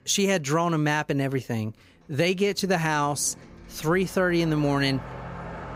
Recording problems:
traffic noise; noticeable; throughout; 15 dB below the speech

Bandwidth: 15.5 kHz